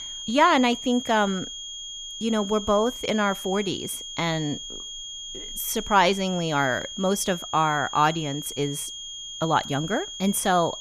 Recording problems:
high-pitched whine; loud; throughout; 3.5 kHz, 9 dB below the speech

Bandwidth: 14.5 kHz